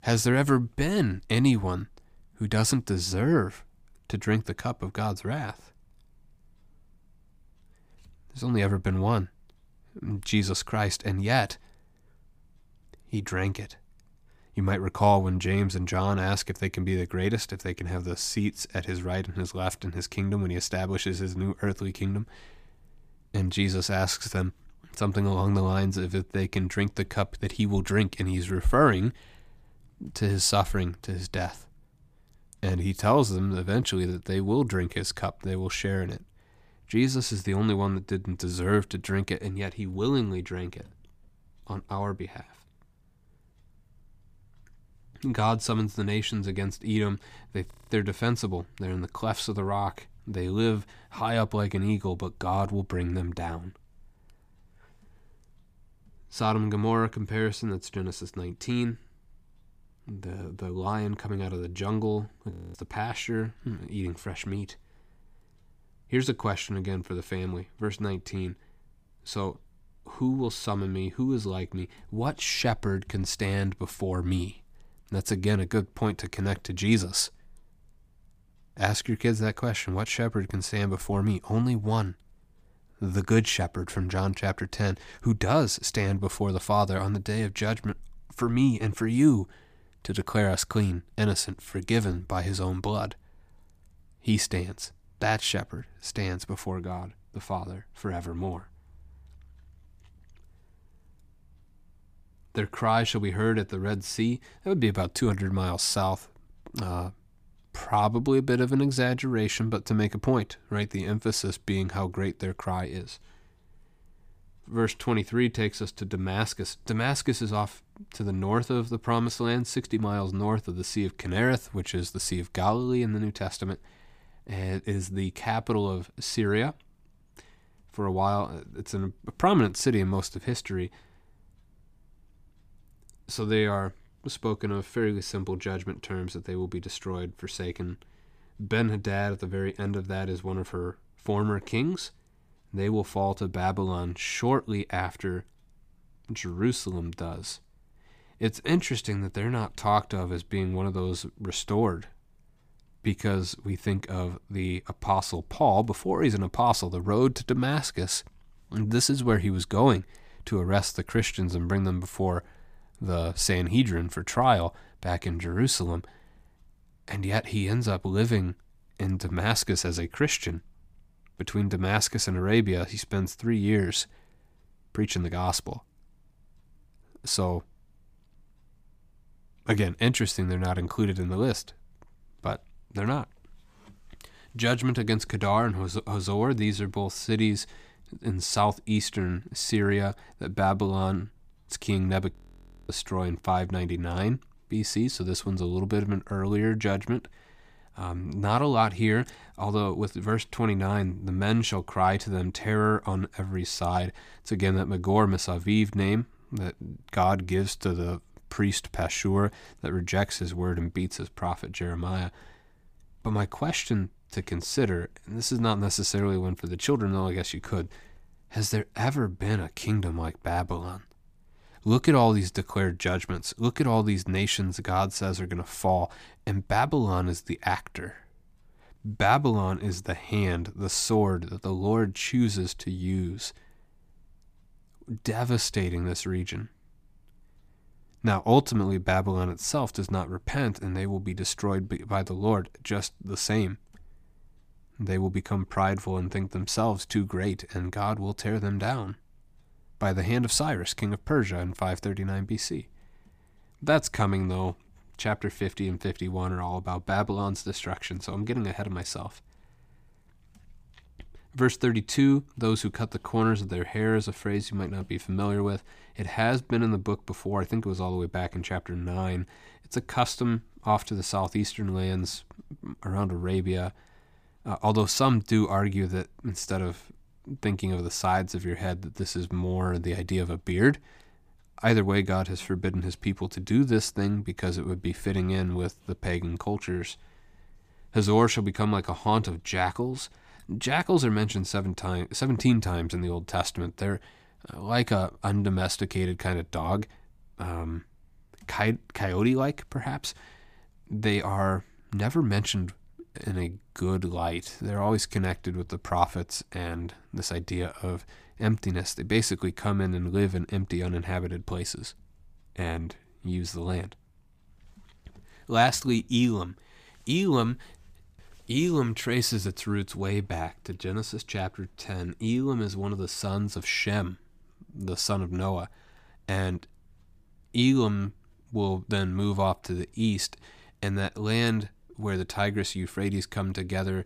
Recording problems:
audio freezing; at 48 s, at 1:03 and at 3:12 for 0.5 s

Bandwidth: 15 kHz